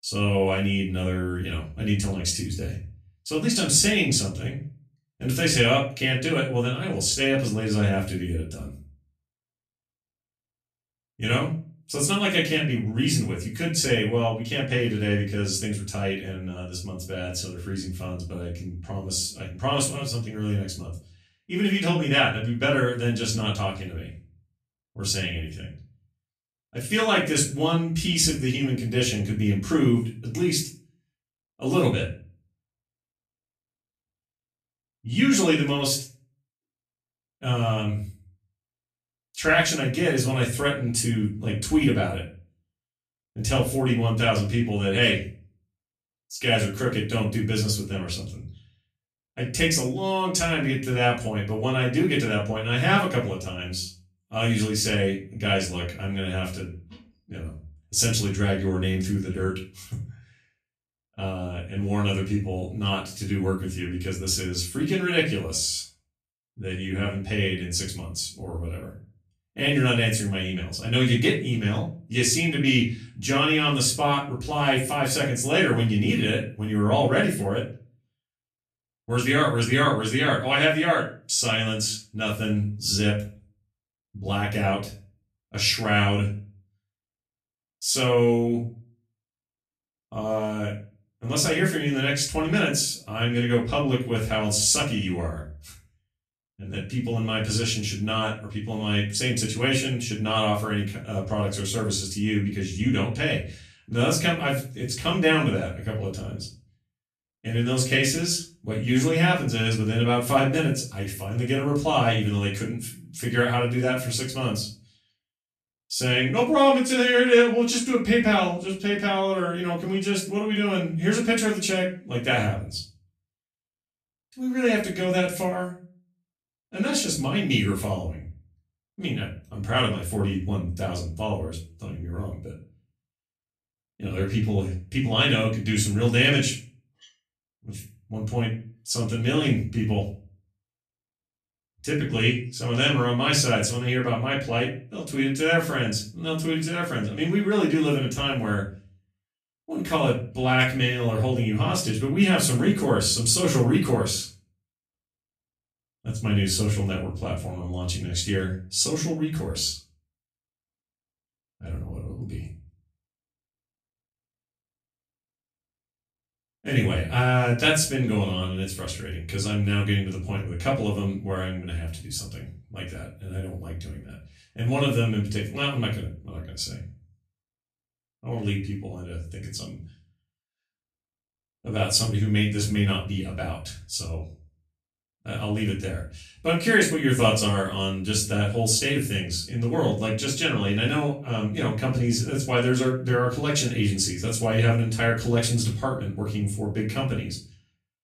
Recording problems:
off-mic speech; far
room echo; slight; dies away in 0.3 s

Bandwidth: 14.5 kHz